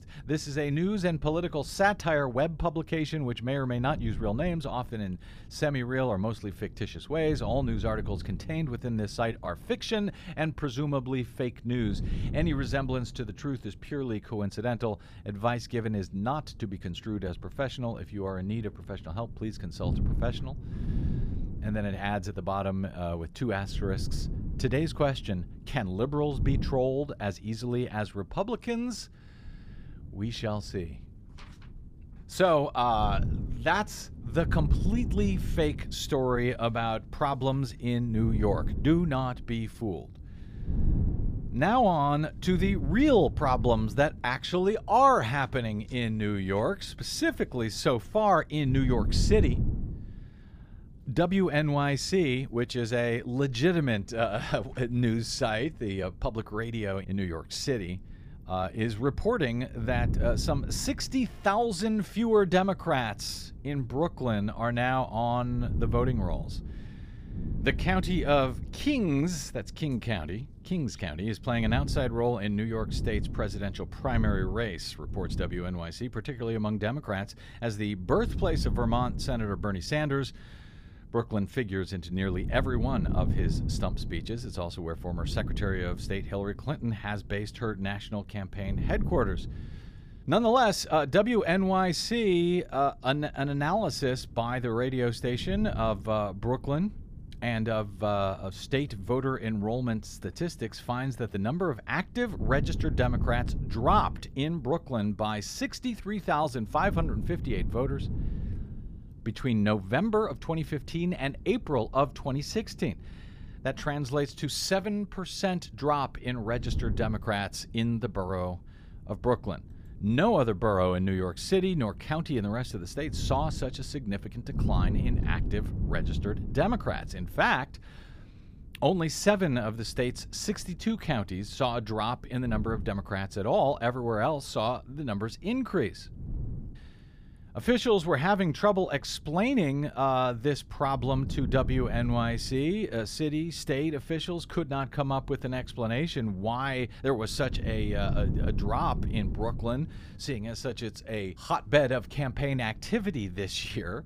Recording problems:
wind noise on the microphone; occasional gusts; 20 dB below the speech

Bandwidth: 15 kHz